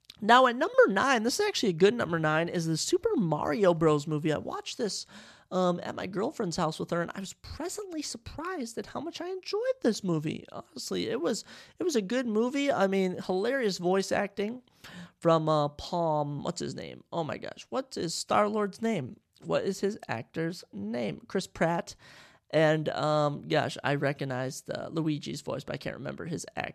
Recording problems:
none

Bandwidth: 13.5 kHz